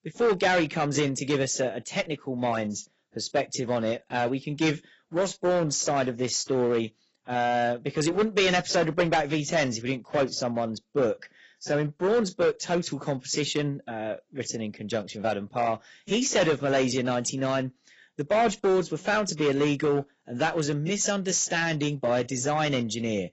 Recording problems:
garbled, watery; badly; nothing above 7.5 kHz
distortion; slight; 6% of the sound clipped

